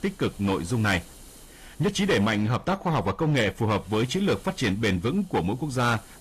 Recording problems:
distortion; slight; 8% of the sound clipped
garbled, watery; slightly; nothing above 14.5 kHz
hiss; faint; throughout; 25 dB below the speech

